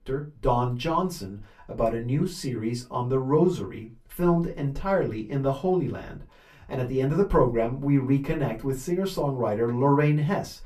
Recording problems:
off-mic speech; far
room echo; very slight; dies away in 0.2 s

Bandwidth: 14.5 kHz